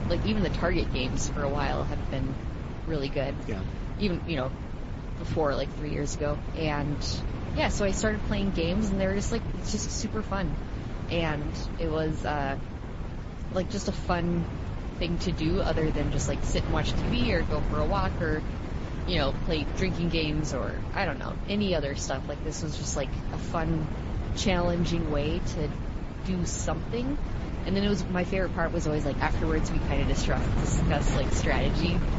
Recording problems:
garbled, watery; slightly; nothing above 7.5 kHz
high frequencies cut off; slight
wind noise on the microphone; heavy; 8 dB below the speech

